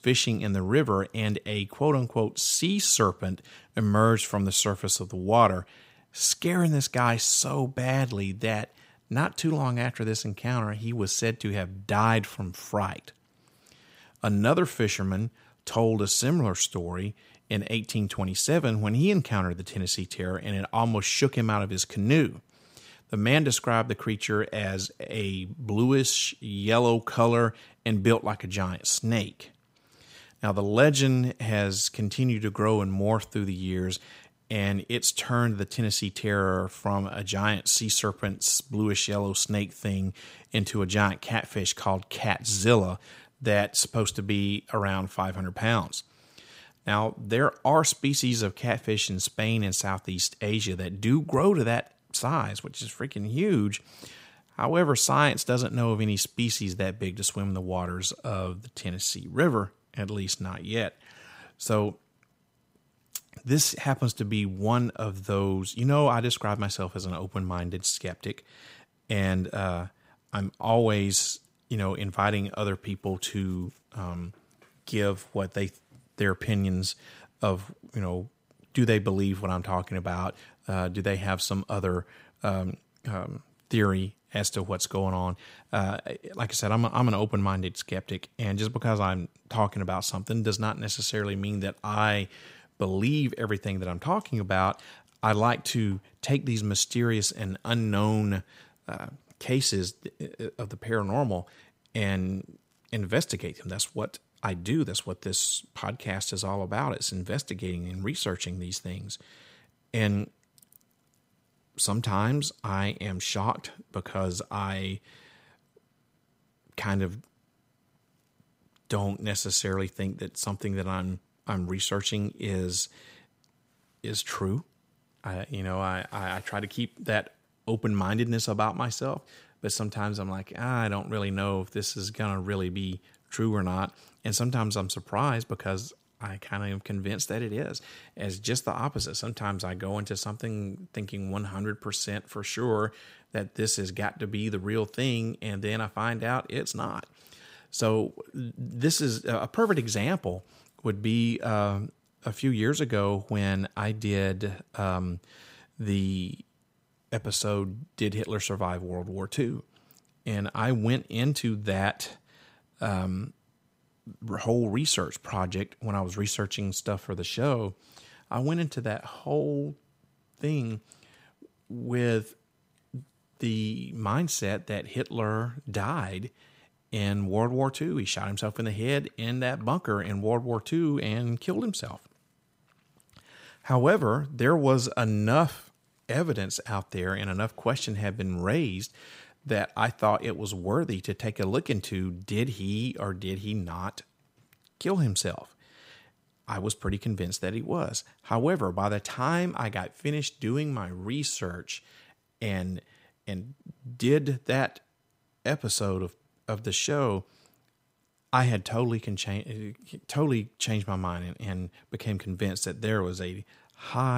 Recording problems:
abrupt cut into speech; at the end

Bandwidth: 15.5 kHz